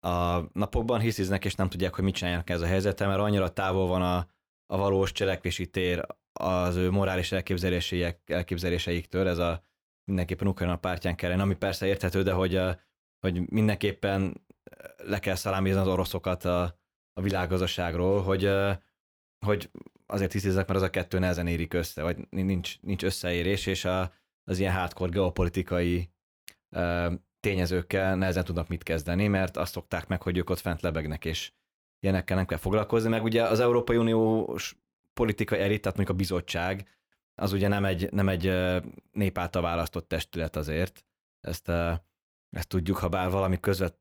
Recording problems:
none

